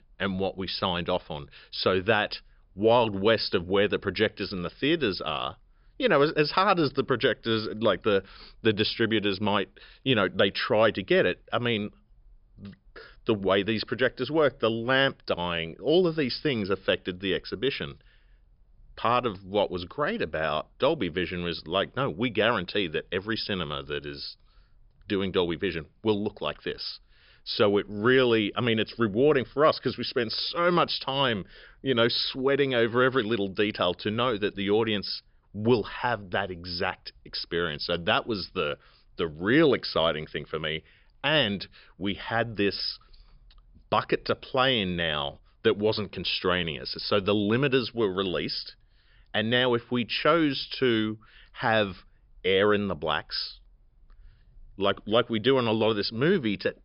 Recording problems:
high frequencies cut off; noticeable; nothing above 5.5 kHz

